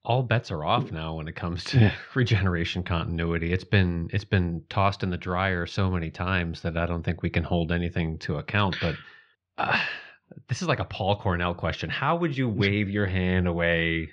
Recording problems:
muffled; slightly; fading above 3.5 kHz

